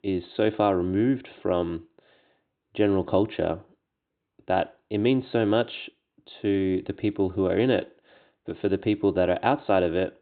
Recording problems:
high frequencies cut off; severe; nothing above 4 kHz

